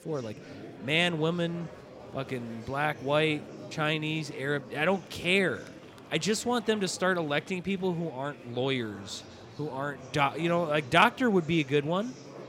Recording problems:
murmuring crowd; noticeable; throughout; 20 dB below the speech

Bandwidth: 16 kHz